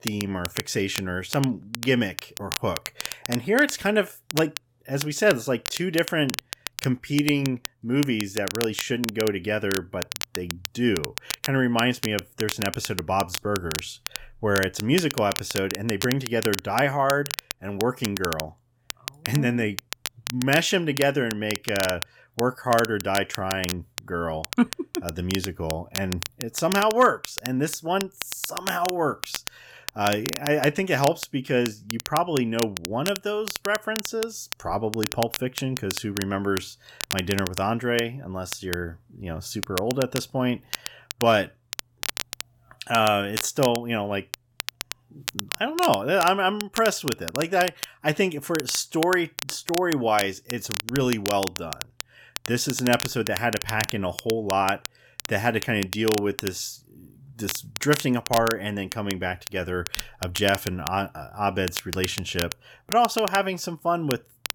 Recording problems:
crackle, like an old record; loud; 8 dB below the speech

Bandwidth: 17 kHz